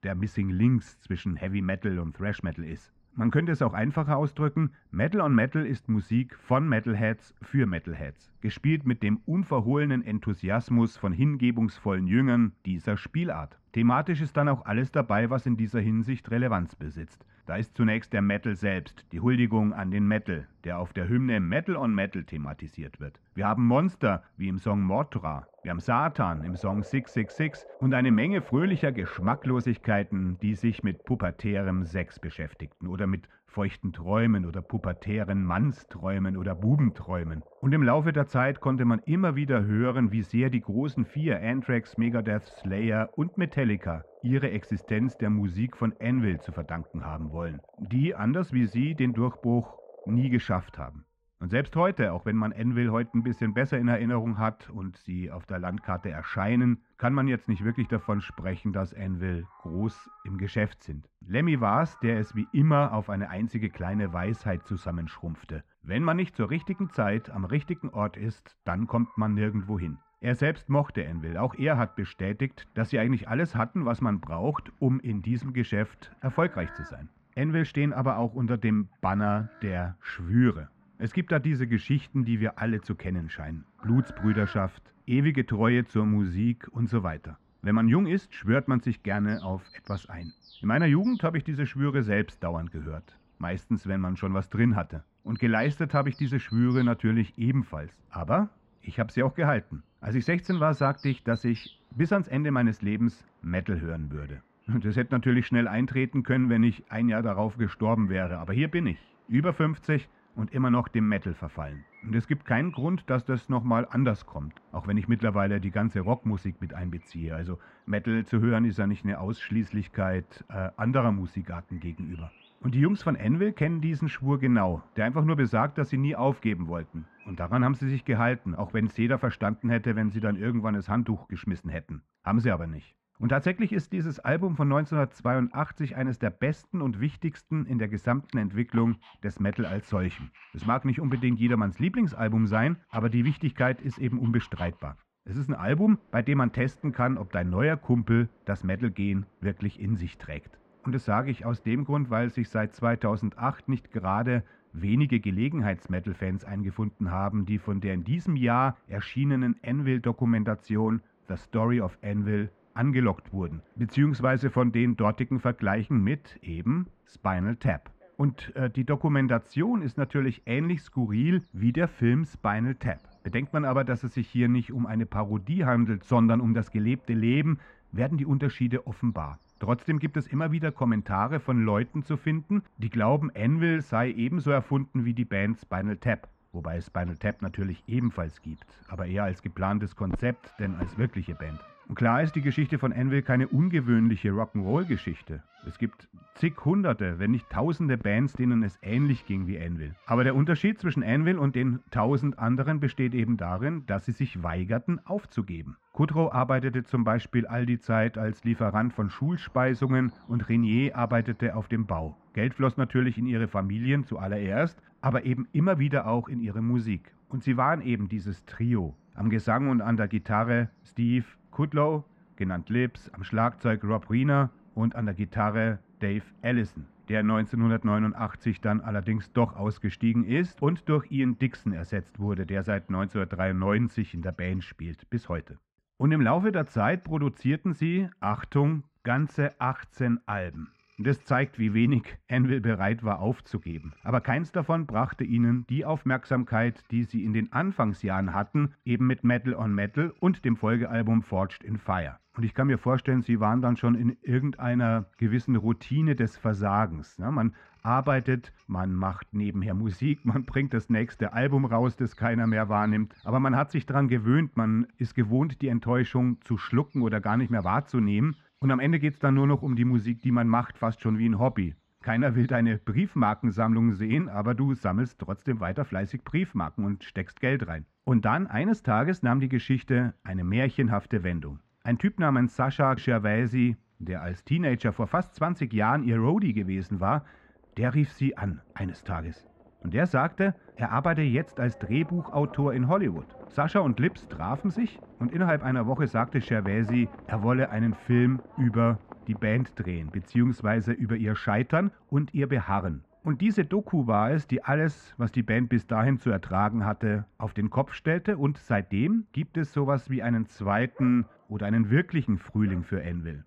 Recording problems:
muffled; very; fading above 1.5 kHz
animal sounds; faint; throughout; 25 dB below the speech

